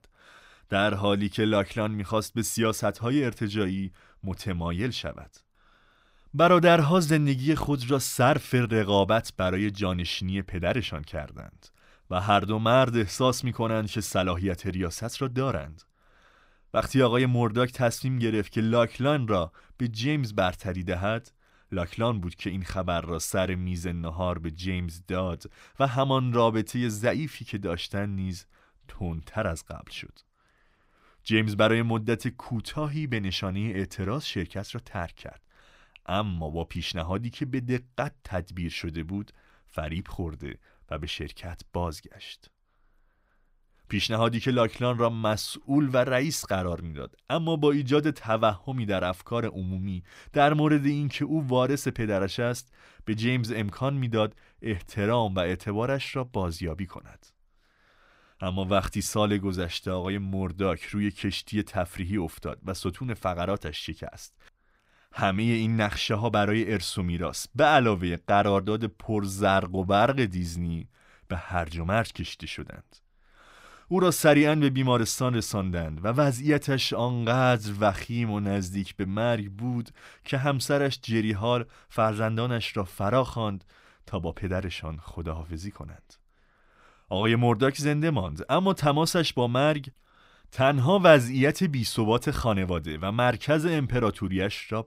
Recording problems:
none

